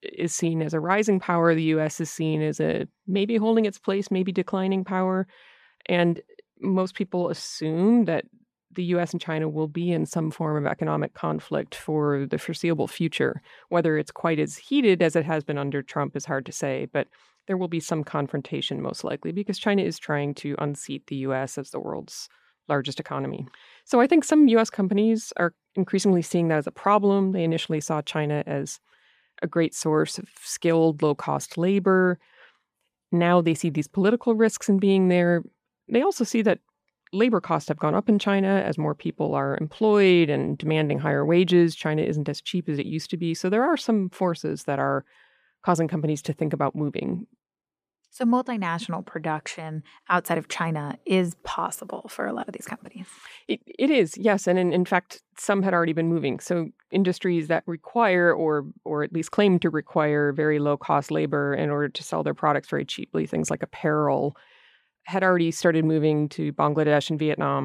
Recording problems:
abrupt cut into speech; at the end

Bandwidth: 15 kHz